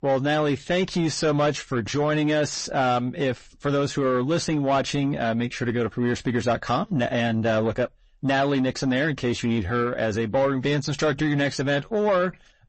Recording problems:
distortion; slight; 10 dB below the speech
garbled, watery; slightly; nothing above 8 kHz

